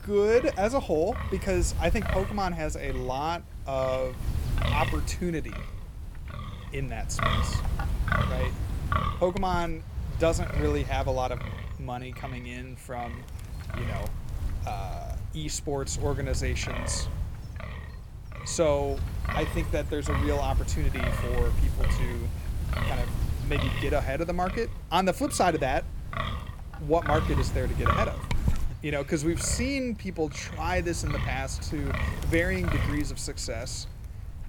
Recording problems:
wind noise on the microphone; heavy; 6 dB below the speech

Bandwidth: 18.5 kHz